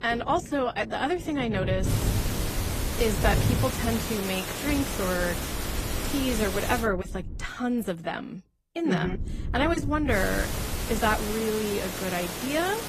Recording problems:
garbled, watery; slightly; nothing above 14.5 kHz
rain or running water; loud; throughout; 5 dB below the speech
hiss; loud; from 2 to 7 s and from 10 s on; 4 dB below the speech
wind noise on the microphone; occasional gusts; from 1.5 to 3.5 s, from 5 to 7.5 s and from 9 to 11 s; 20 dB below the speech

